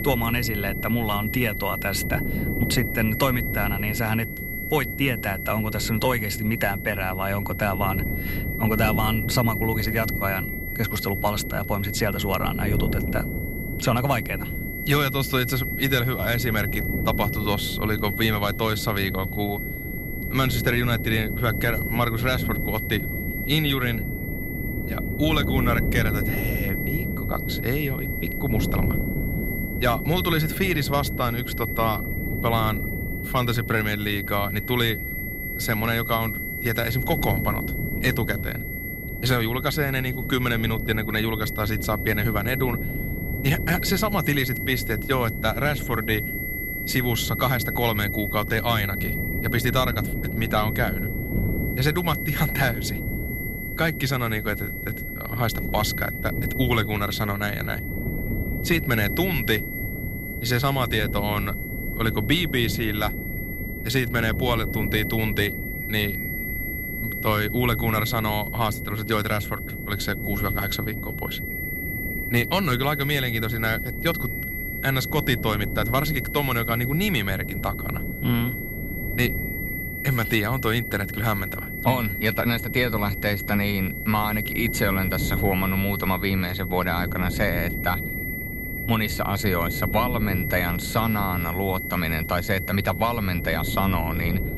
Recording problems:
high-pitched whine; loud; throughout; 2 kHz, 6 dB below the speech
wind noise on the microphone; occasional gusts; 15 dB below the speech

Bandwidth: 15.5 kHz